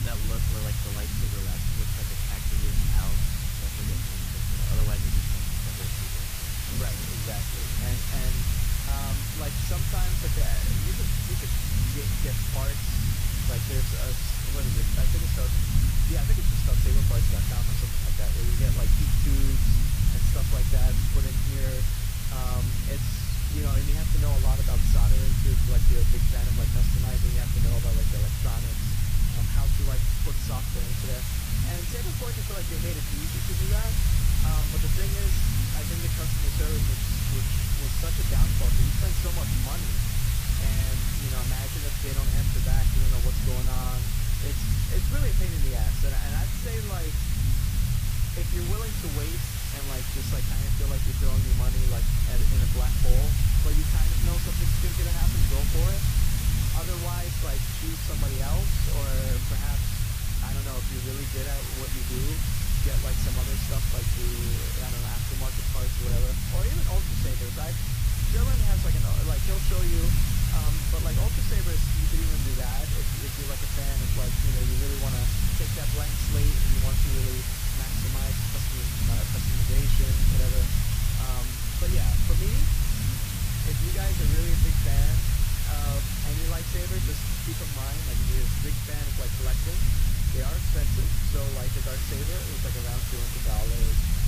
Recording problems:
garbled, watery; slightly; nothing above 15.5 kHz
hiss; very loud; throughout; 9 dB above the speech
low rumble; loud; throughout; as loud as the speech

